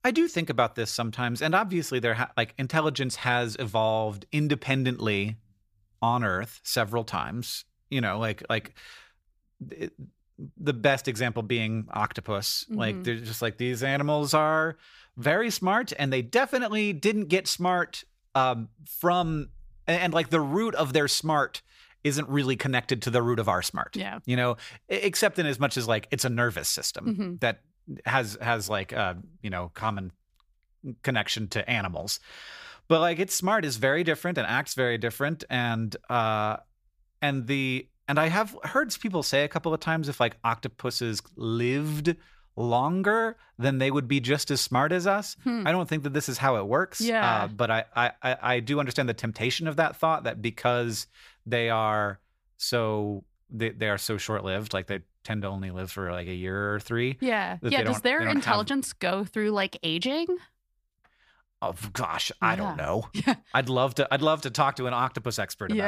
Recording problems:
abrupt cut into speech; at the end

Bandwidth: 15 kHz